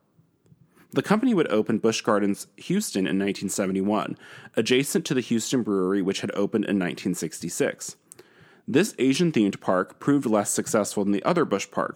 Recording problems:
none

